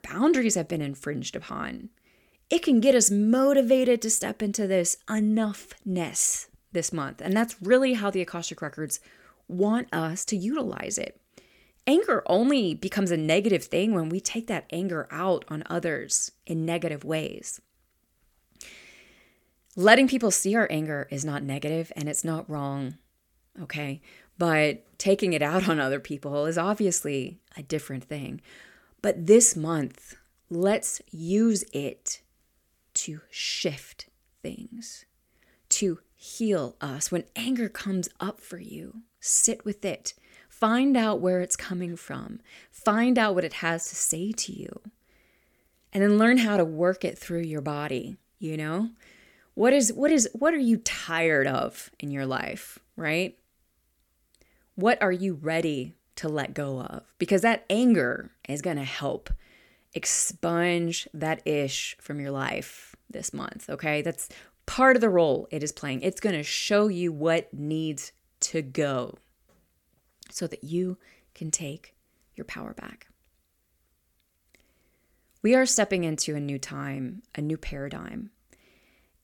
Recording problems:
none

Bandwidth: 18 kHz